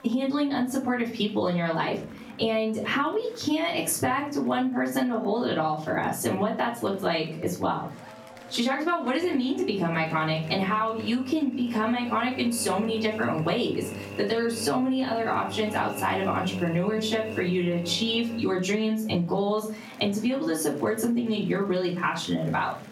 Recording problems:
off-mic speech; far
room echo; slight; dies away in 0.4 s
squashed, flat; somewhat
electrical hum; noticeable; from 9 to 18 s; 50 Hz, 15 dB below the speech
murmuring crowd; faint; throughout; 25 dB below the speech

